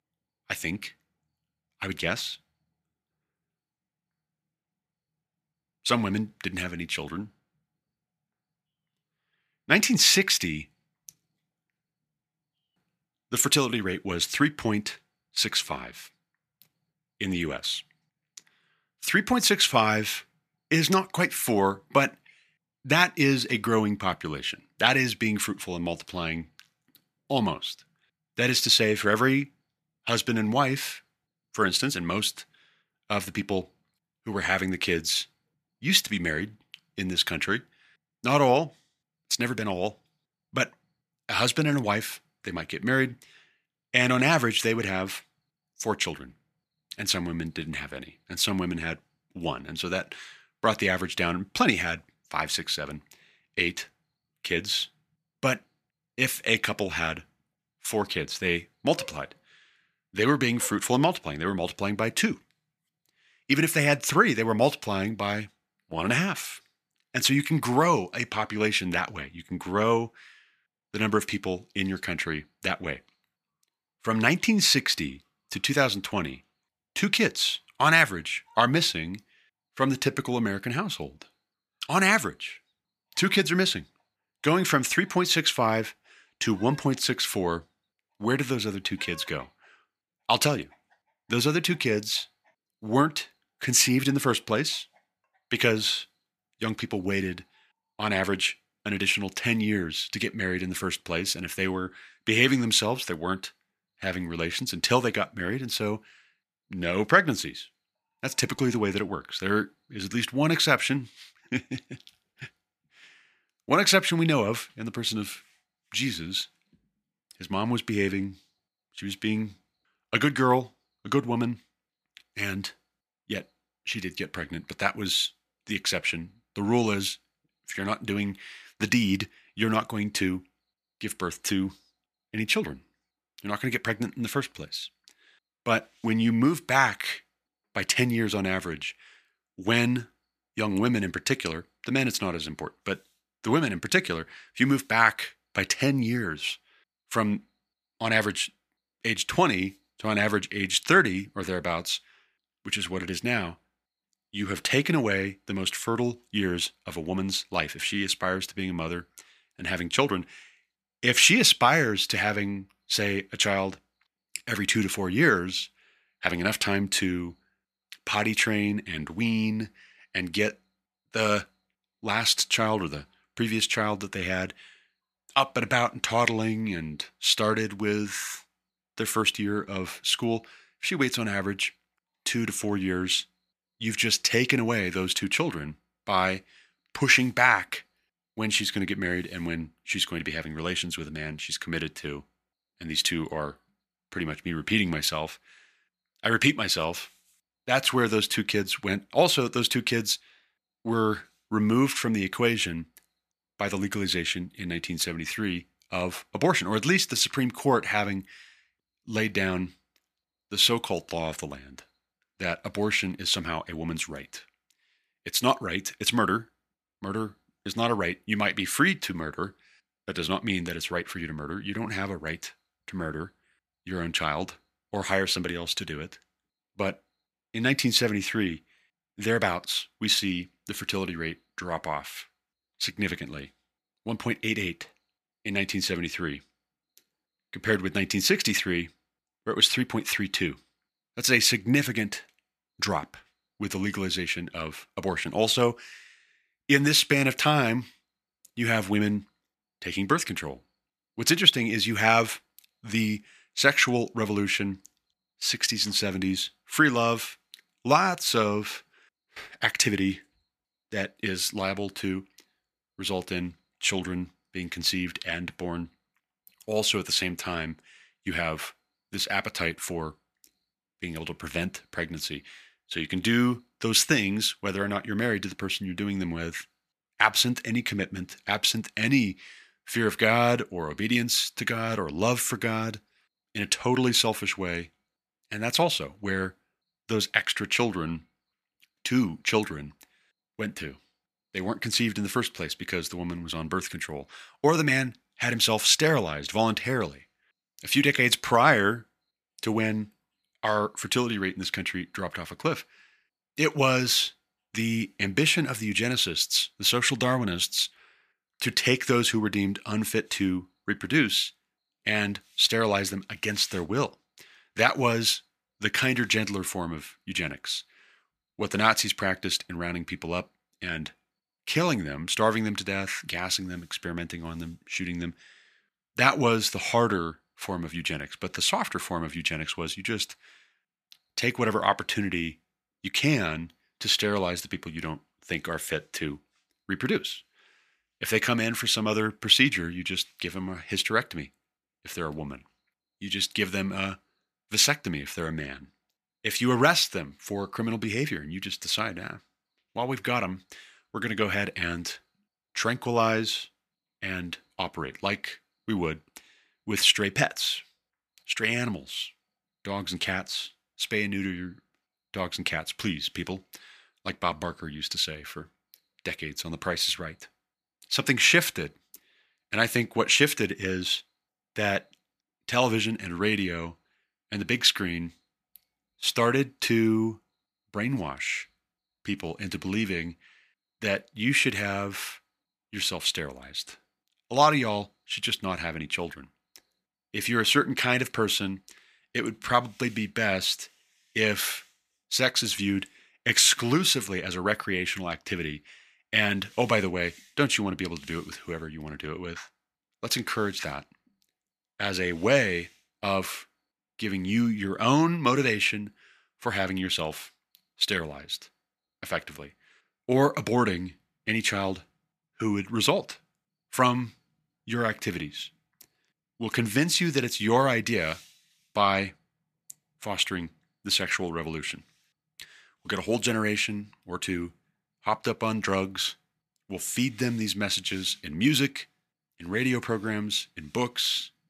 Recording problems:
thin; somewhat; fading below 850 Hz

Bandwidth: 14.5 kHz